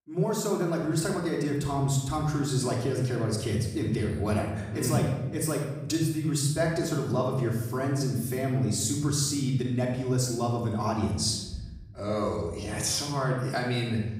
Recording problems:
off-mic speech; far
room echo; noticeable; dies away in 1 s

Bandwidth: 15.5 kHz